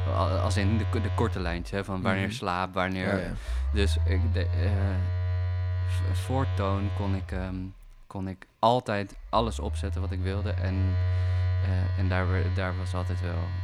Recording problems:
alarms or sirens; very loud; throughout; 2 dB above the speech

